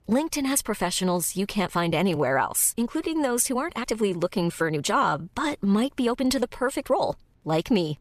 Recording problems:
uneven, jittery; strongly; from 1 to 7 s

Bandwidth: 14.5 kHz